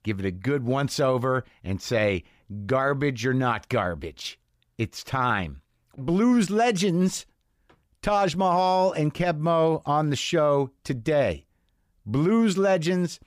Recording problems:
none

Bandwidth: 15 kHz